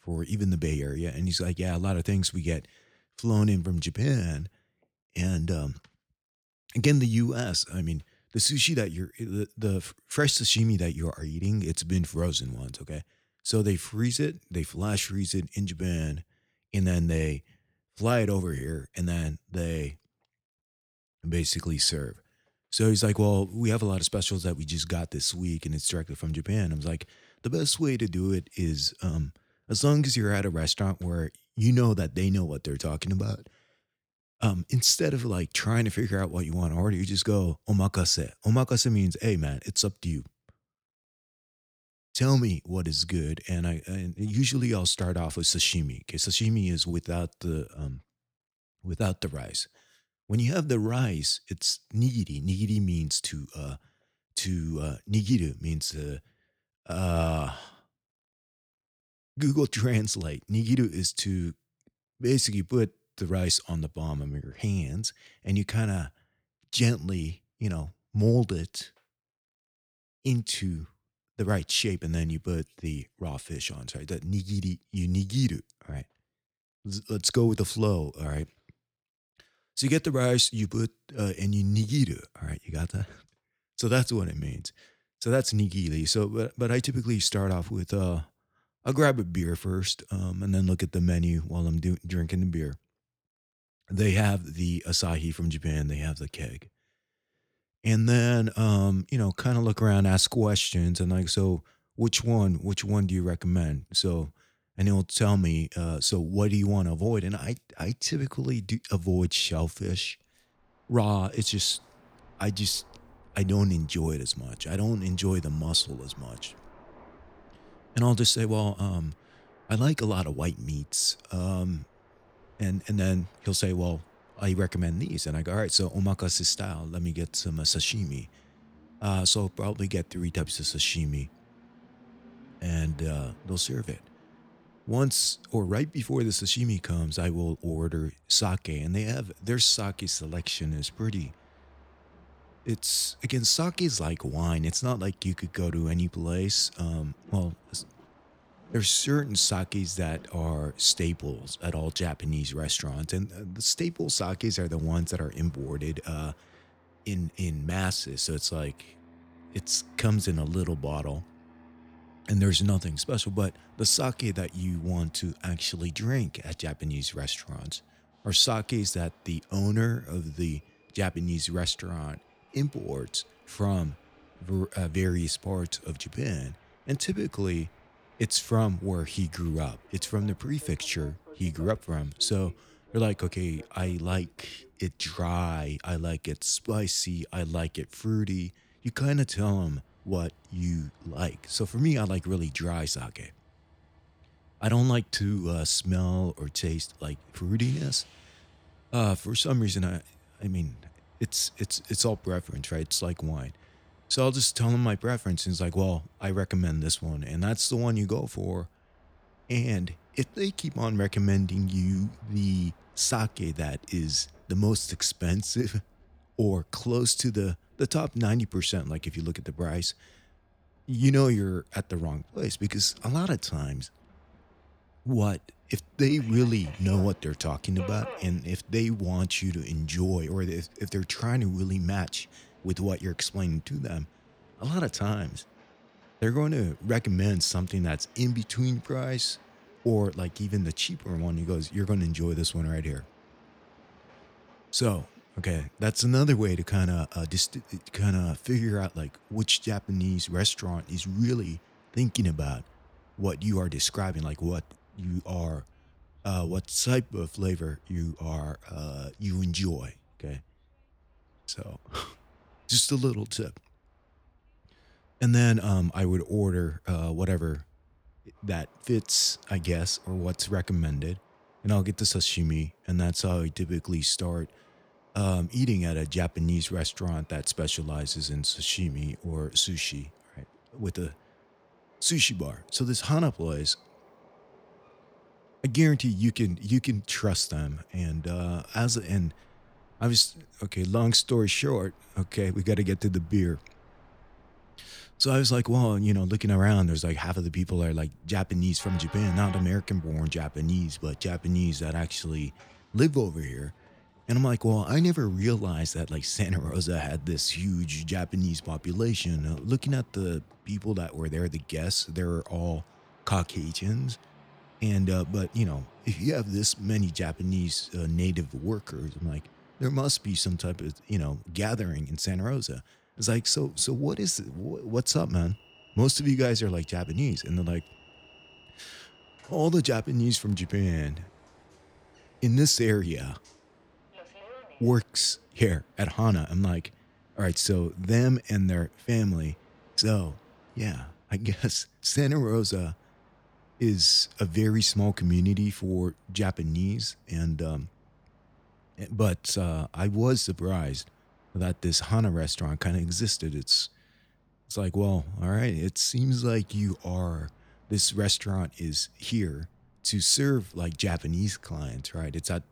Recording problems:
train or aircraft noise; faint; from 1:51 on; 30 dB below the speech

